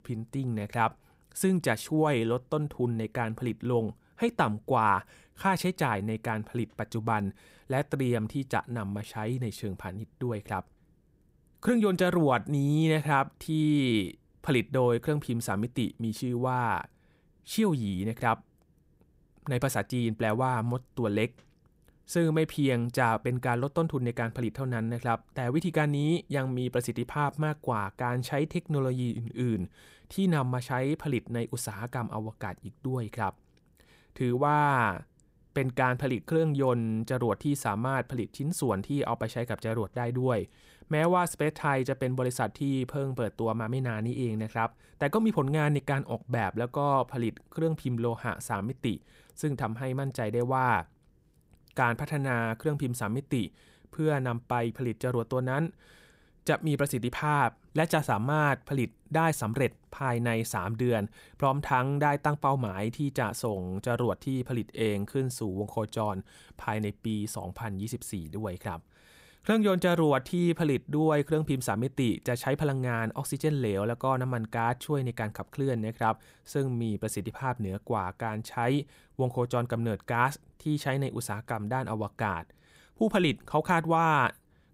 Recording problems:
none

